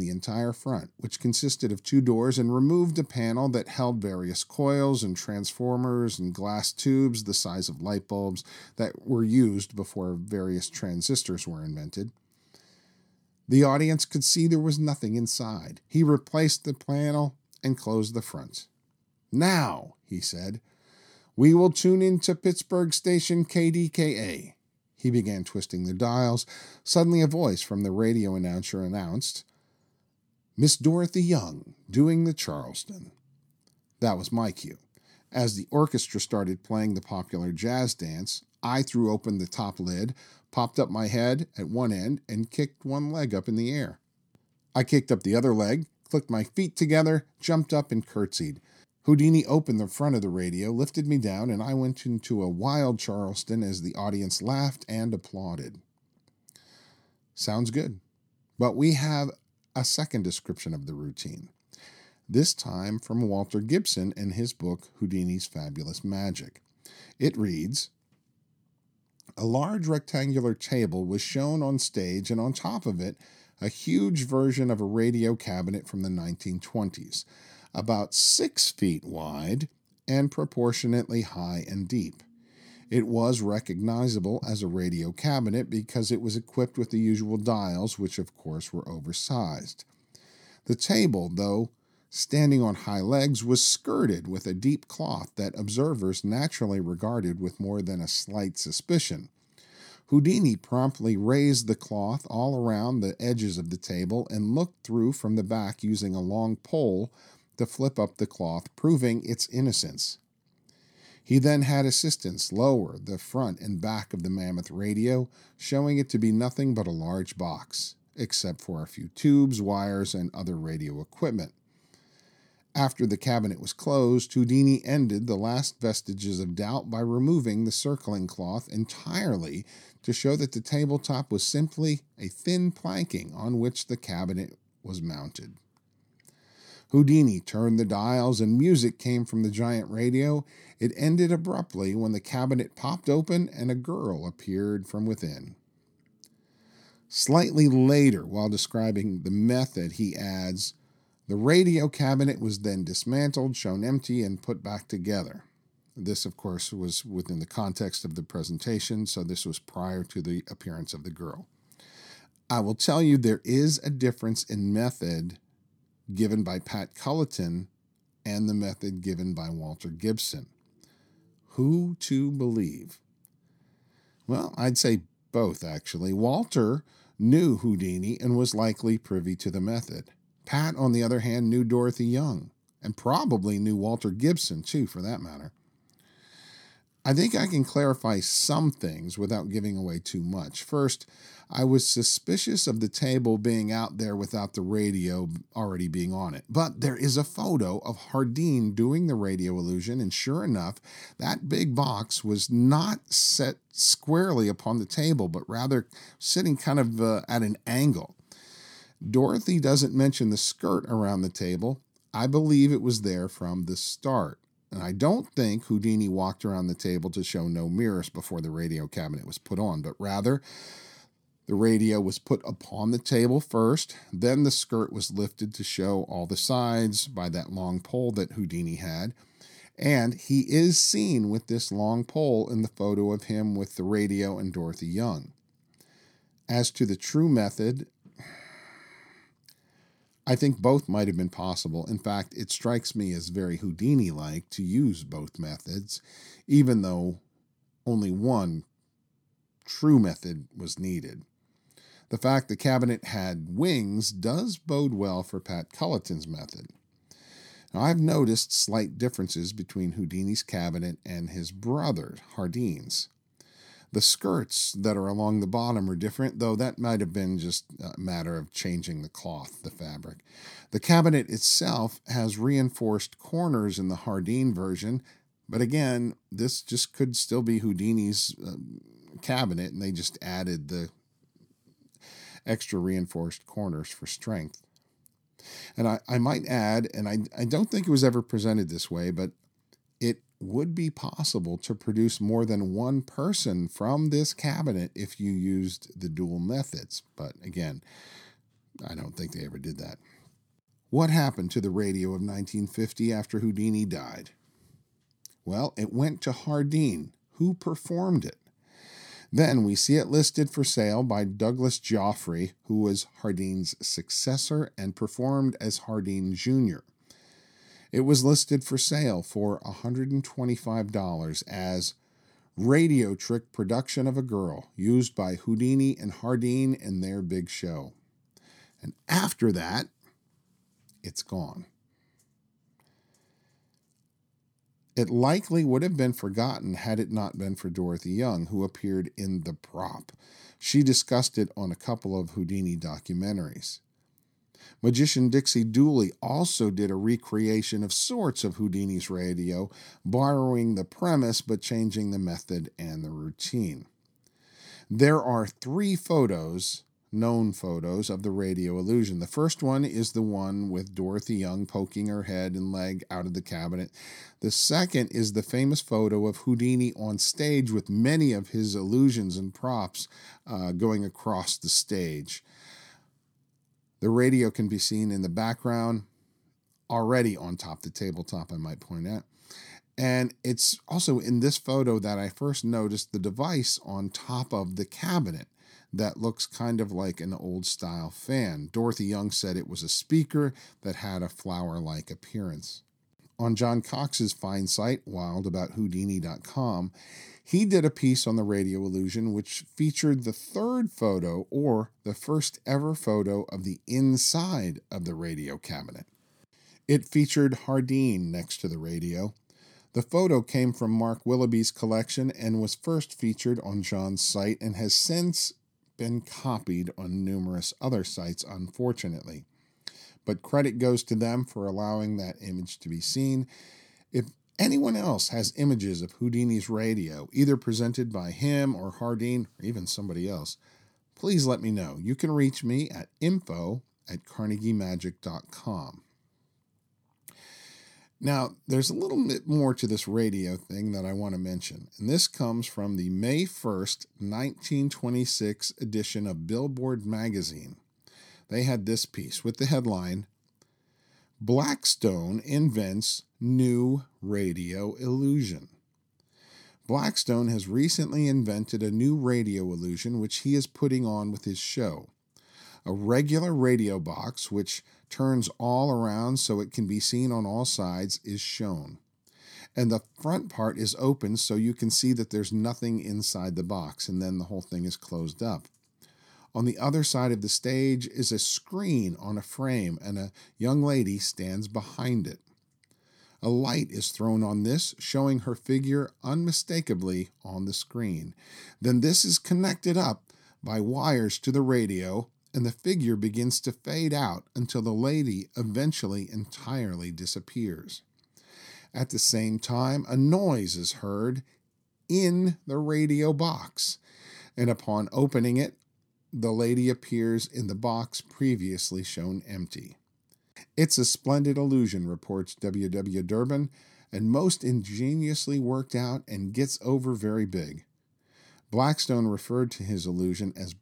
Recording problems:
abrupt cut into speech; at the start

